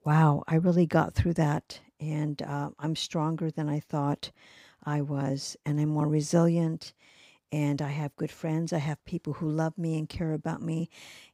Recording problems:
none

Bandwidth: 15.5 kHz